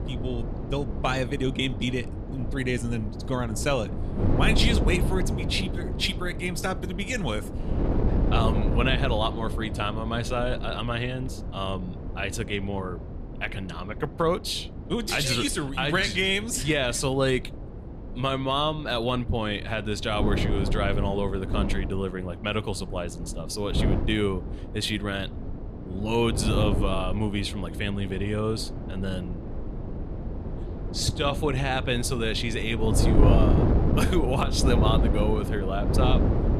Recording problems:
wind noise on the microphone; heavy; 8 dB below the speech

